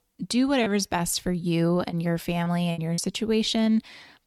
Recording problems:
choppy; occasionally; 4% of the speech affected

